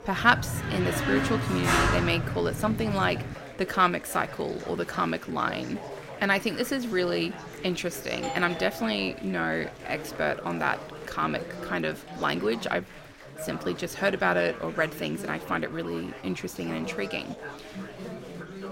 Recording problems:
chatter from many people; noticeable; throughout; 10 dB below the speech
door banging; loud; until 3.5 s; peak 5 dB above the speech
doorbell; noticeable; from 8 to 9.5 s; peak 8 dB below the speech

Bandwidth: 16 kHz